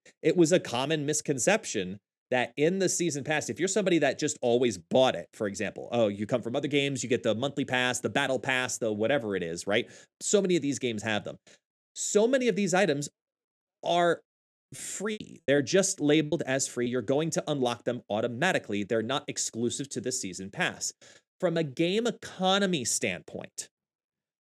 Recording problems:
choppy; very; from 15 to 17 s; 12% of the speech affected

